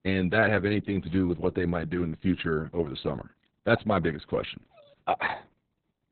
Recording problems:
garbled, watery; badly; nothing above 4 kHz

